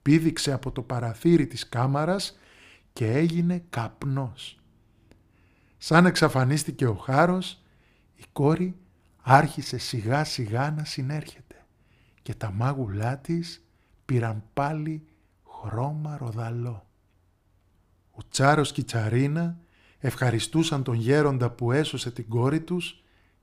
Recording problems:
none

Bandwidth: 15 kHz